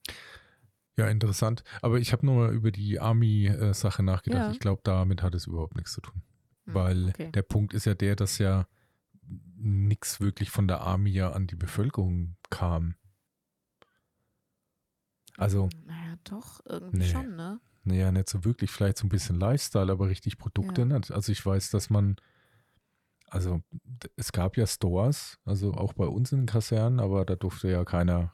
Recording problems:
none

